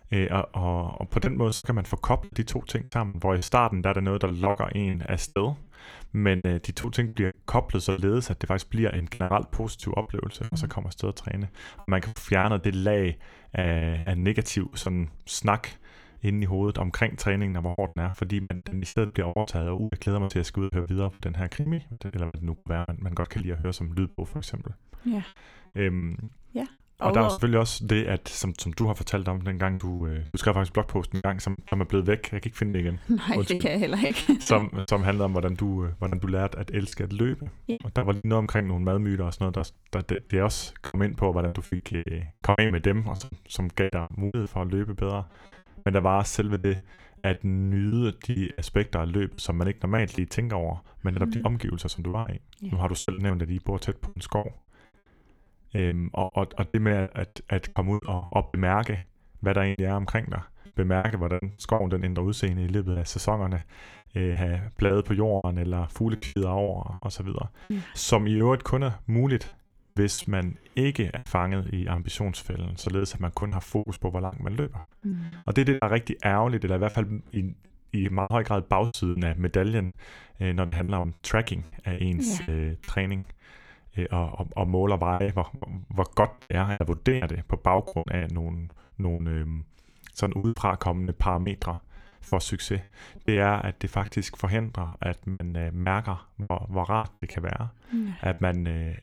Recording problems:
choppy; very; 13% of the speech affected

